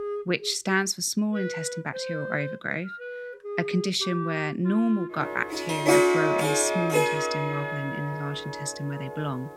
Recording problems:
background music; loud; throughout; as loud as the speech

